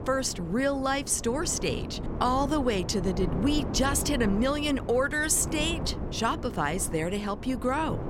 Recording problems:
wind noise on the microphone; occasional gusts; 10 dB below the speech

